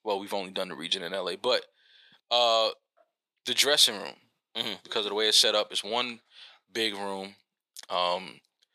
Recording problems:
thin; somewhat; fading below 450 Hz

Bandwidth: 14.5 kHz